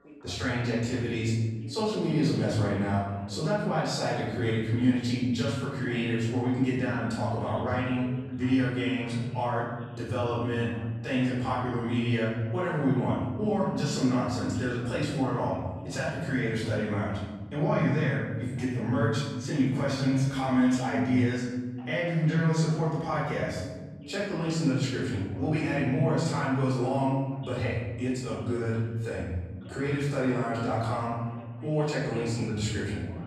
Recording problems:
off-mic speech; far
room echo; noticeable; dies away in 1.4 s
voice in the background; faint; throughout; 20 dB below the speech

